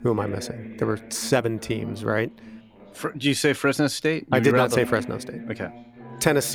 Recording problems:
voice in the background; noticeable; throughout; 15 dB below the speech
background music; faint; throughout; 20 dB below the speech
abrupt cut into speech; at the end

